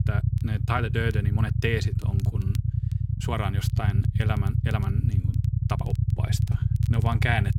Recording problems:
low rumble; loud; throughout; 7 dB below the speech
crackle, like an old record; faint; 25 dB below the speech
uneven, jittery; strongly; from 0.5 to 7 s

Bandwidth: 16 kHz